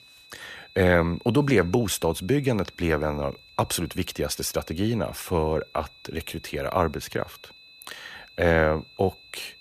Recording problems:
high-pitched whine; faint; throughout; 4 kHz, 25 dB below the speech

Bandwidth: 14.5 kHz